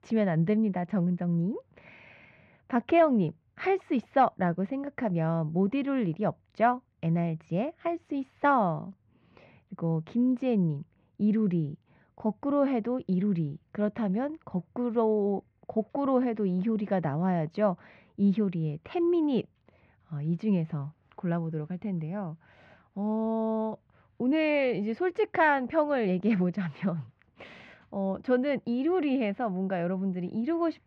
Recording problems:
muffled; very; fading above 2.5 kHz

